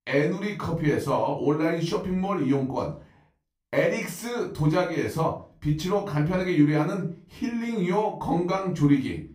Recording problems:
off-mic speech; far
room echo; slight; dies away in 0.3 s

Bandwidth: 15.5 kHz